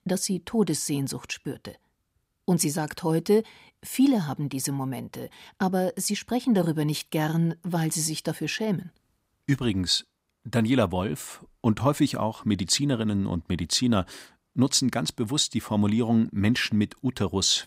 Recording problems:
none

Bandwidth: 15.5 kHz